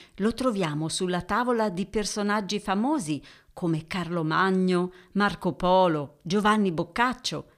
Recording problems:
none

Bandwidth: 15 kHz